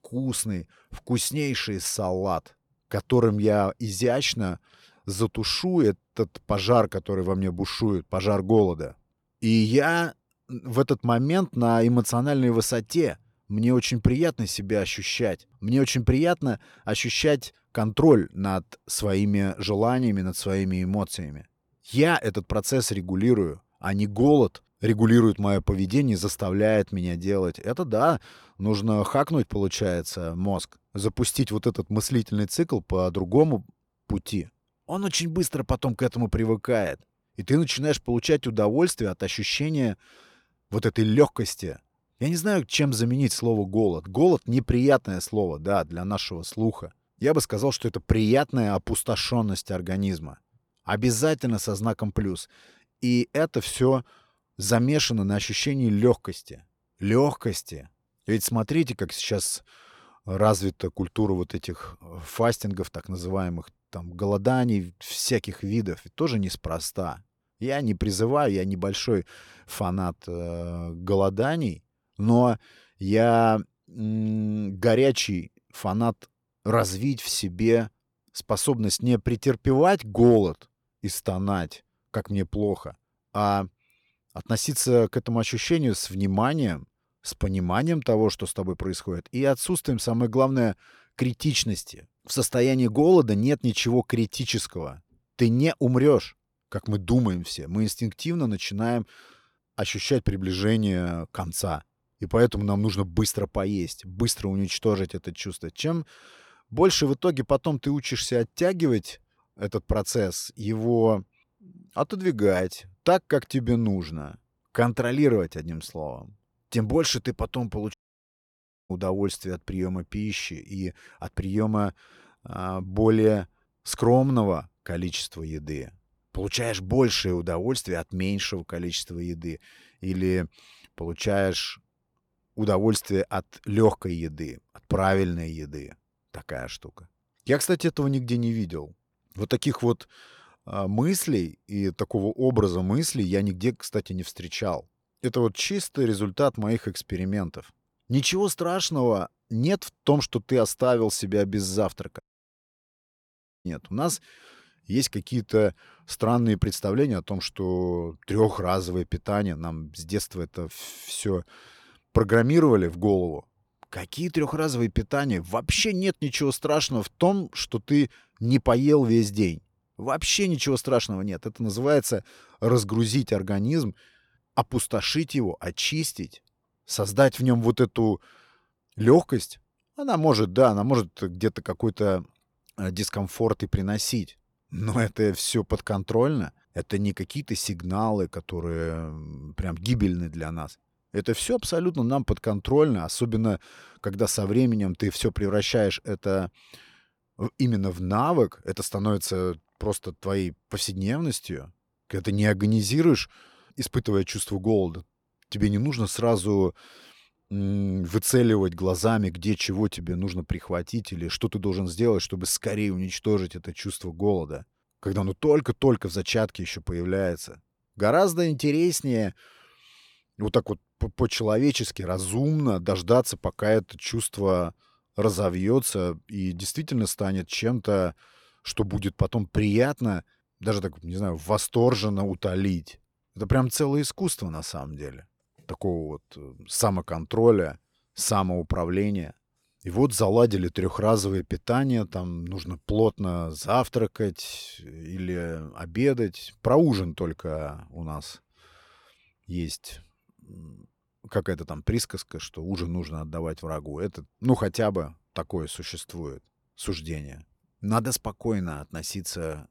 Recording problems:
audio cutting out; at 1:58 for 1 s and at 2:32 for 1.5 s

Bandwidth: 19 kHz